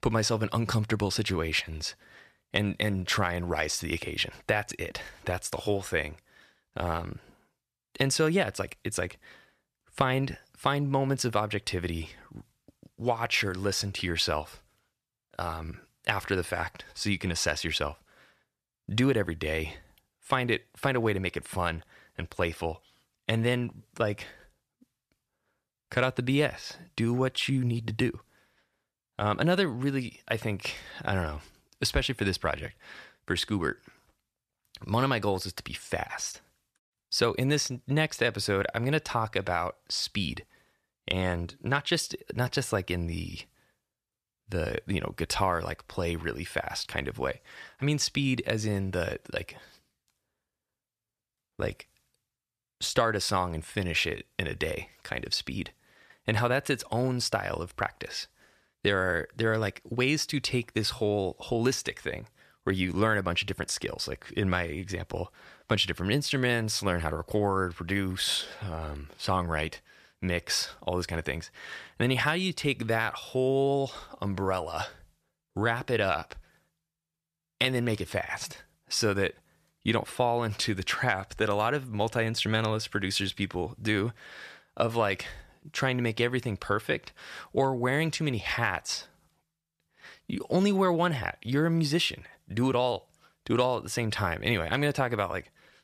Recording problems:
none

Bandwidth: 14.5 kHz